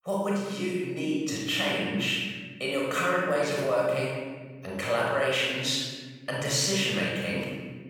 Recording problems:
room echo; strong; dies away in 1.3 s
off-mic speech; far

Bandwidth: 18.5 kHz